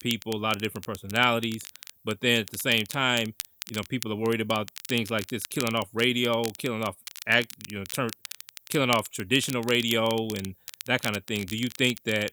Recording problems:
crackle, like an old record; noticeable; 15 dB below the speech

